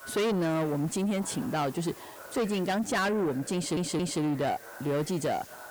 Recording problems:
distortion; heavy; 8 dB below the speech
background chatter; noticeable; throughout; 2 voices, 20 dB below the speech
hiss; noticeable; throughout; 20 dB below the speech
audio stuttering; at 3.5 s

